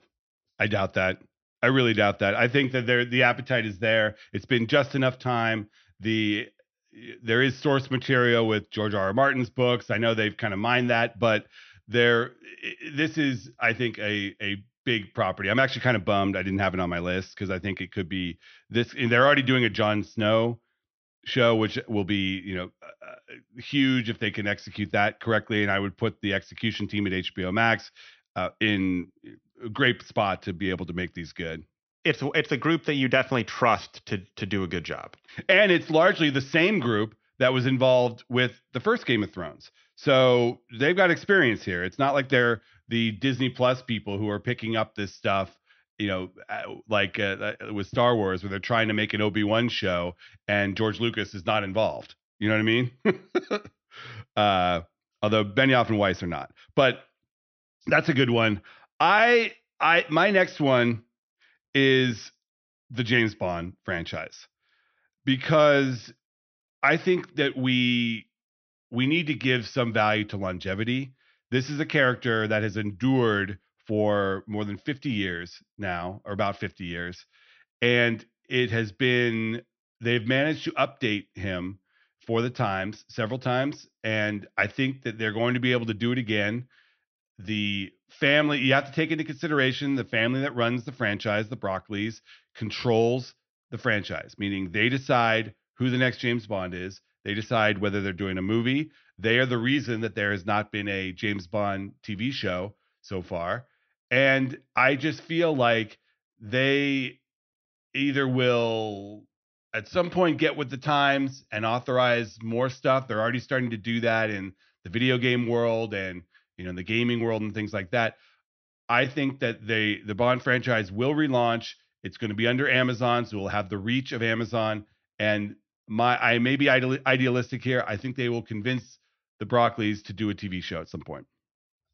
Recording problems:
high frequencies cut off; noticeable; nothing above 6 kHz

